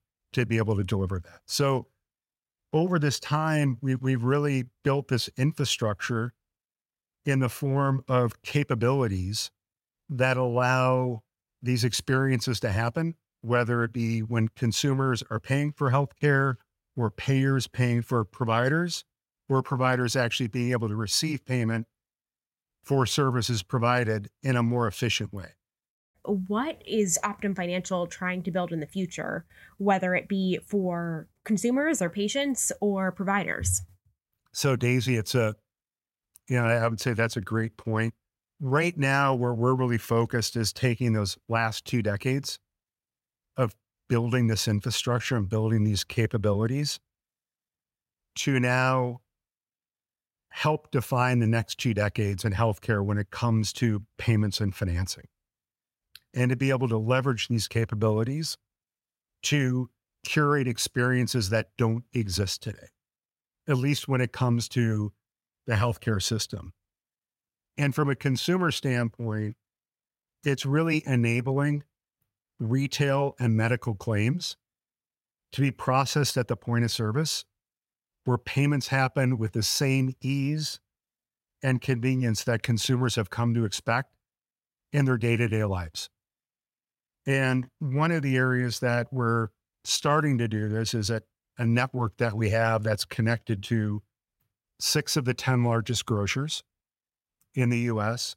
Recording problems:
none

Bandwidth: 16 kHz